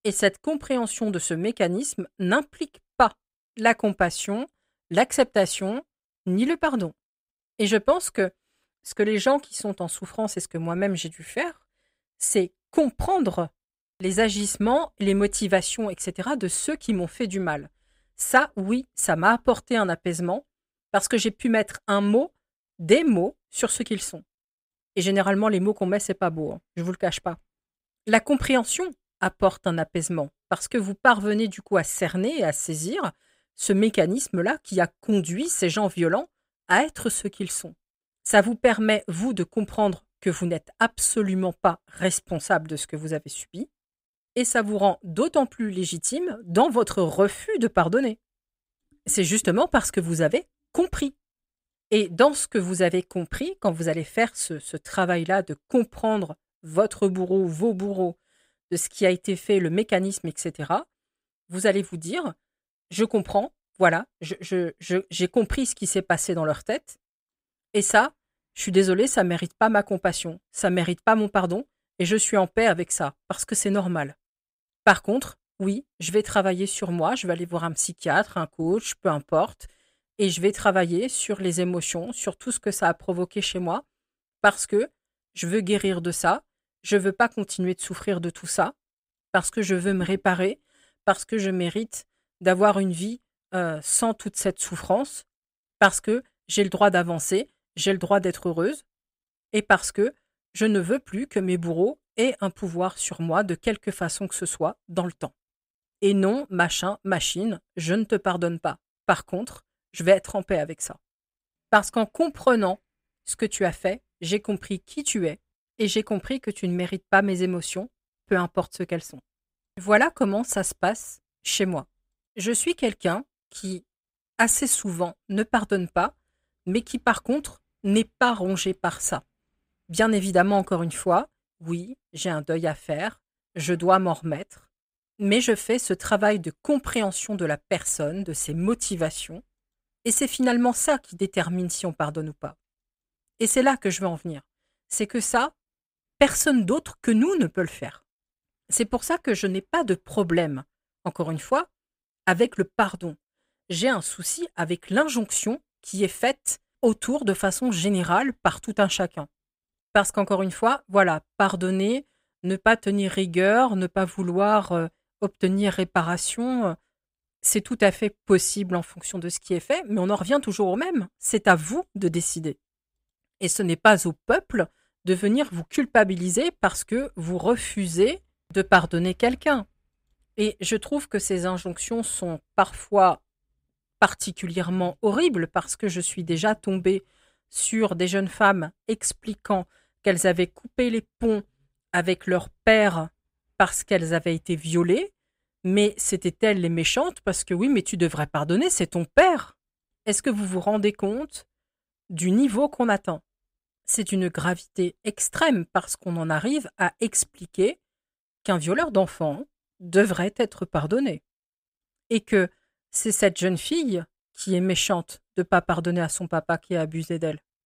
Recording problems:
none

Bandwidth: 15.5 kHz